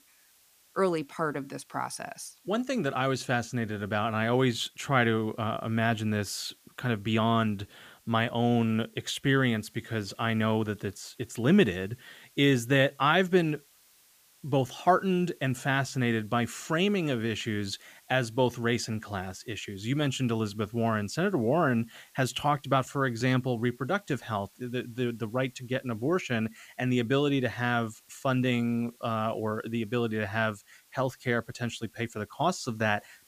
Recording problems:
hiss; faint; throughout; 30 dB below the speech

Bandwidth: 15 kHz